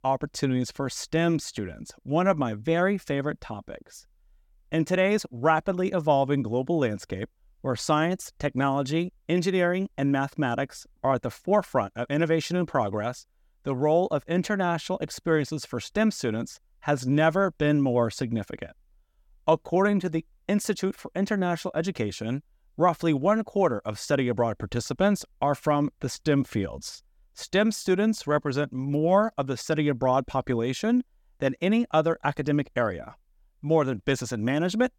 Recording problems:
none

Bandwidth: 17.5 kHz